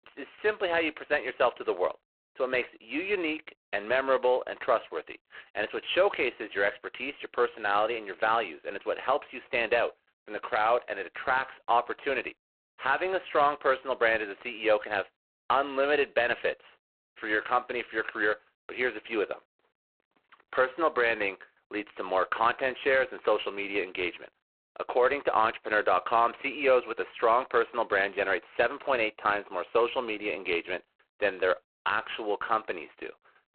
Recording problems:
phone-call audio; poor line; nothing above 4 kHz

